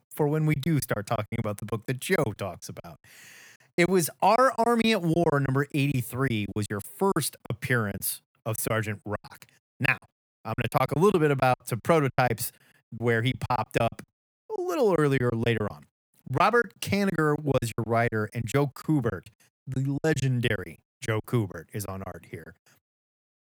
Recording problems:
choppy; very; 14% of the speech affected

